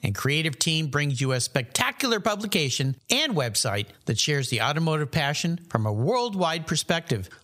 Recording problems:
squashed, flat; somewhat

